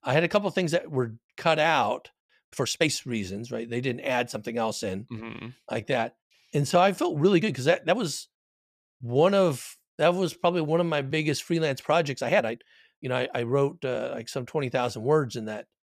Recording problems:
uneven, jittery; strongly; from 0.5 to 14 s

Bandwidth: 14.5 kHz